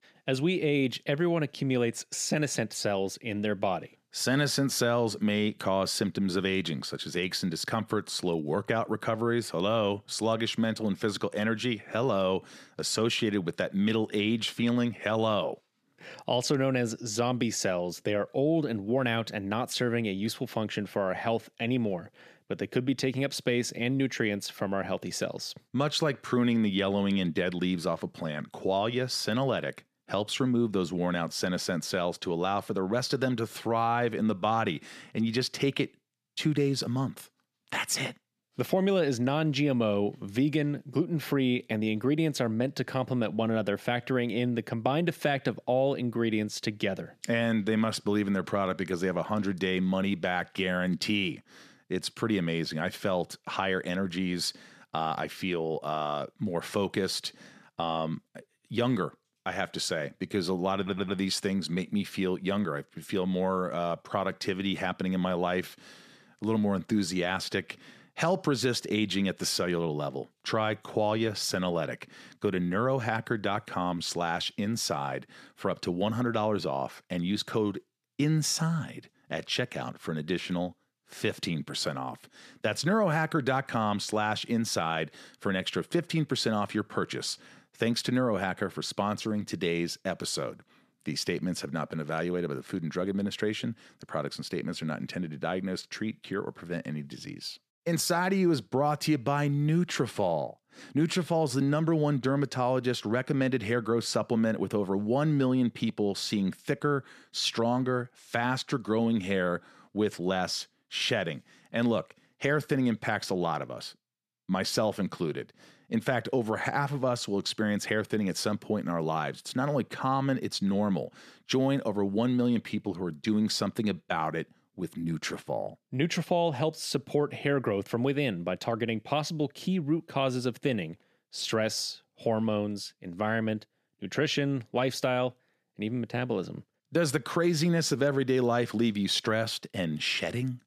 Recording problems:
audio stuttering; at 1:01

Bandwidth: 14.5 kHz